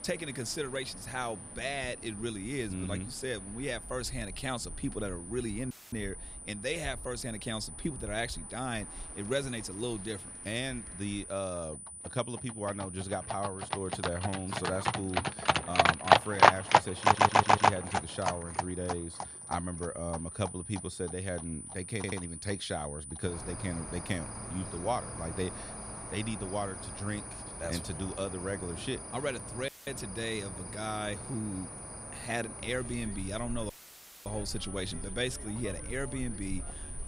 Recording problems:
animal sounds; very loud; throughout; 7 dB above the speech
high-pitched whine; loud; throughout; 9.5 kHz, 6 dB below the speech
audio cutting out; filled with static; at 5.5 s, at 30 s and at 34 s for 0.5 s
audio stuttering; at 17 s and at 22 s

